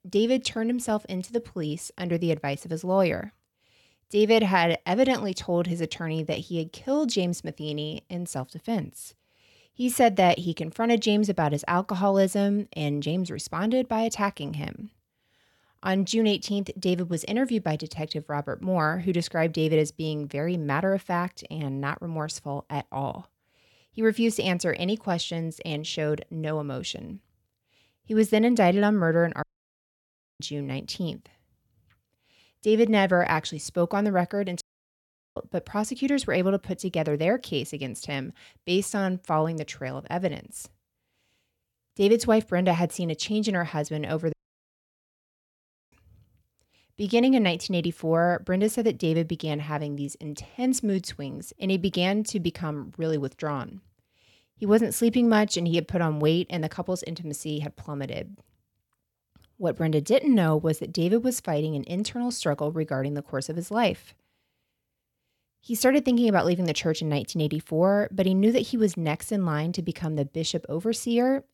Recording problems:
audio cutting out; at 29 s for 1 s, at 35 s for 1 s and at 44 s for 1.5 s

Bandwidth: 17 kHz